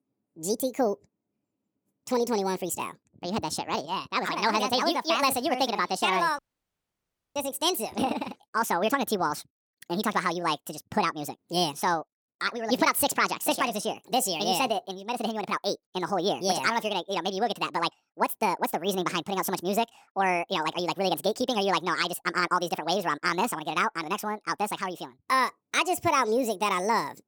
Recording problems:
wrong speed and pitch; too fast and too high; 1.7 times normal speed
audio cutting out; at 6.5 s for 1 s

